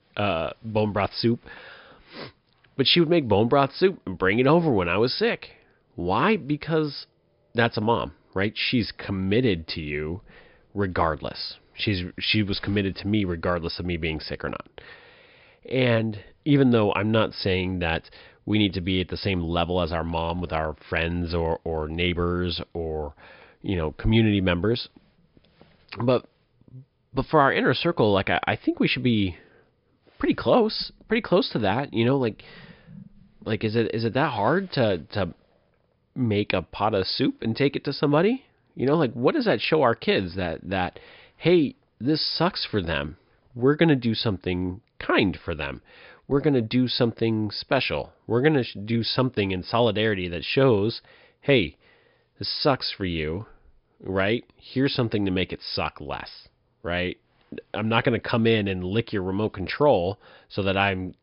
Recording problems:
high frequencies cut off; noticeable; nothing above 5.5 kHz

